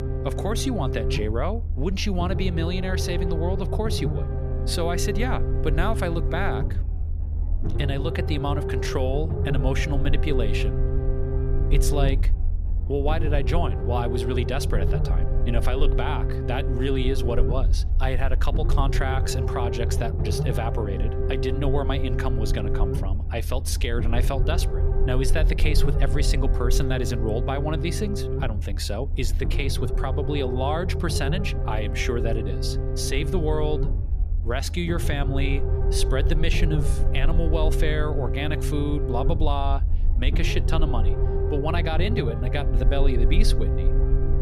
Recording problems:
low rumble; loud; throughout; 5 dB below the speech

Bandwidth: 14.5 kHz